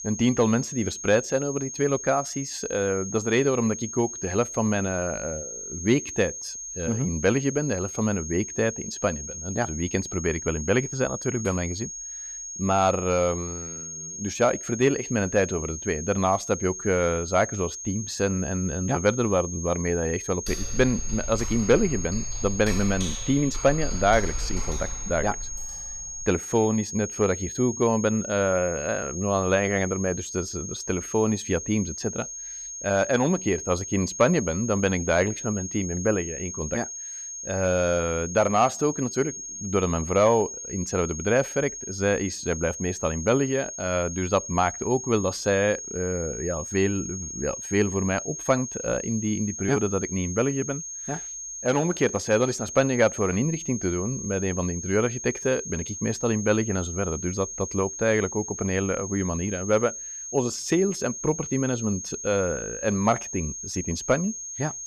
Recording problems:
high-pitched whine; loud; throughout; 6.5 kHz, 8 dB below the speech
keyboard typing; noticeable; from 20 to 26 s; peak 7 dB below the speech

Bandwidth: 14.5 kHz